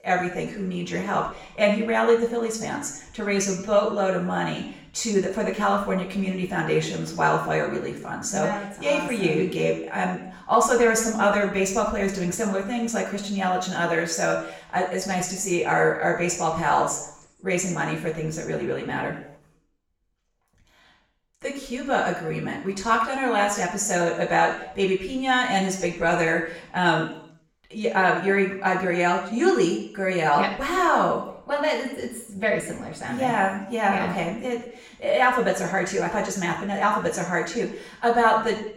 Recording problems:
off-mic speech; far
room echo; noticeable; dies away in 0.6 s

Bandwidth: 18.5 kHz